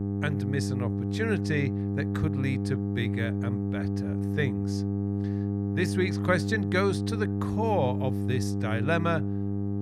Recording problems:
electrical hum; loud; throughout; 50 Hz, 5 dB below the speech

